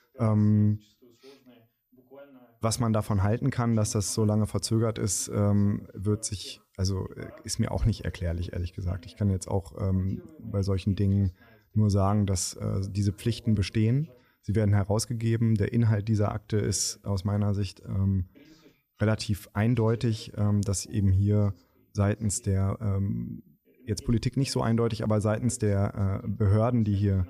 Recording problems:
voice in the background; faint; throughout; 30 dB below the speech

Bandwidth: 14.5 kHz